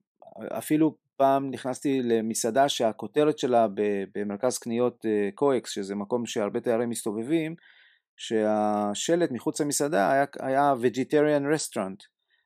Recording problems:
none

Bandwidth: 14.5 kHz